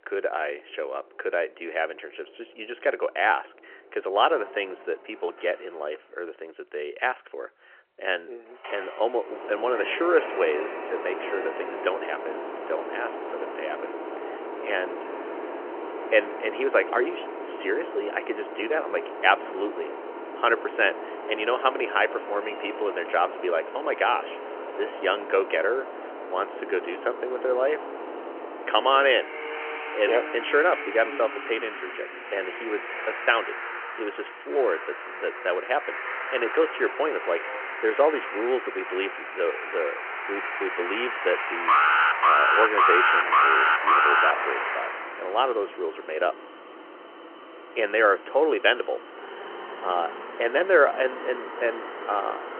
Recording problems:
phone-call audio; nothing above 3 kHz
traffic noise; loud; throughout; 7 dB below the speech
alarm; loud; from 42 to 44 s; peak 9 dB above the speech

